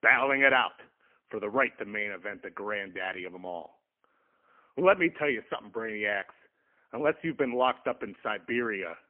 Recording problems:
phone-call audio; poor line; nothing above 3 kHz

